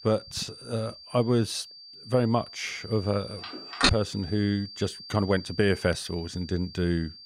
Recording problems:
high-pitched whine; noticeable; throughout; 4.5 kHz, 15 dB below the speech
phone ringing; loud; at 4 s; peak 4 dB above the speech

